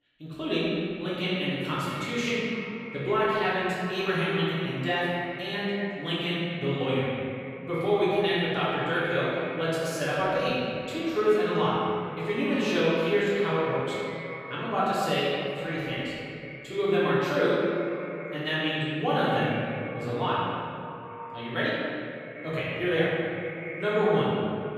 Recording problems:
room echo; strong; dies away in 2.3 s
off-mic speech; far
echo of what is said; noticeable; throughout; 240 ms later, 15 dB below the speech

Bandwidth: 15.5 kHz